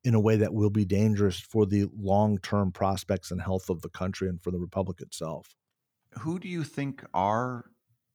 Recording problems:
none

